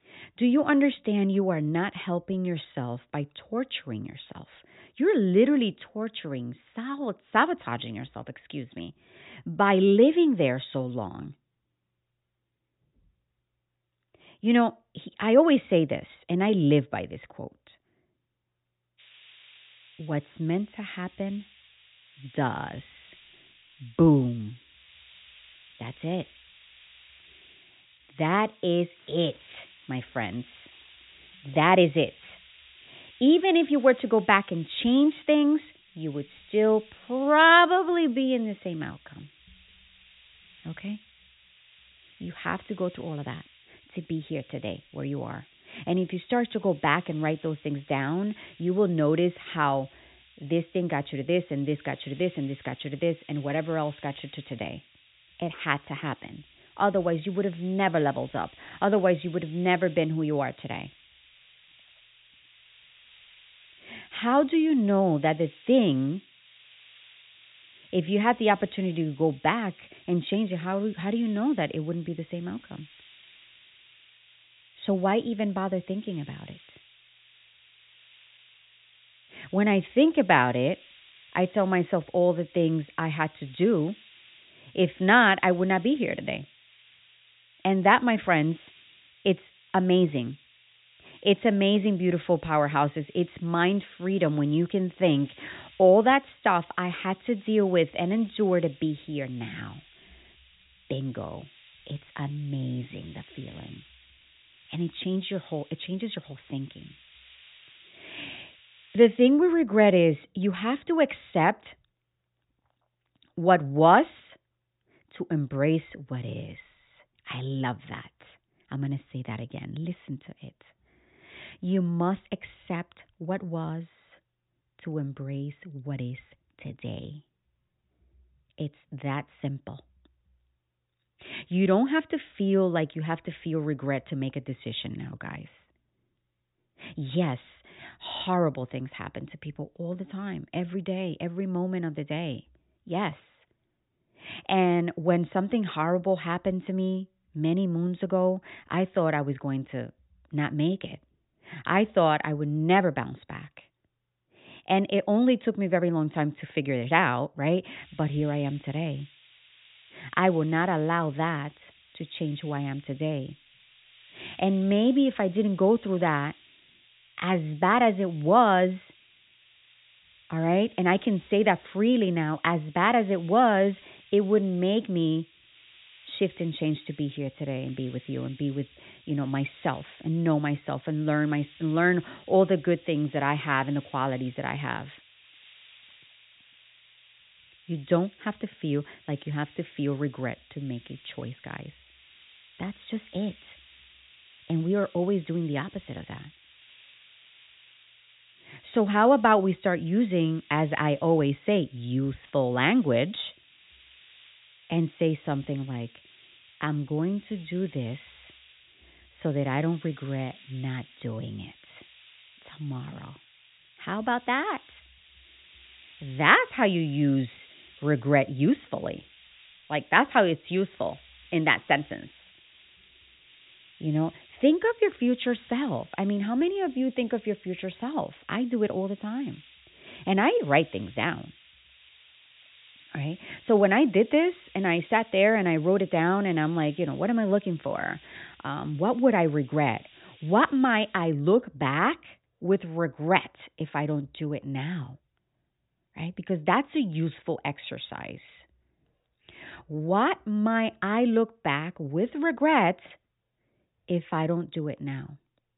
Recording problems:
high frequencies cut off; severe; nothing above 4 kHz
hiss; faint; from 19 s to 1:49 and from 2:38 to 4:01; 25 dB below the speech

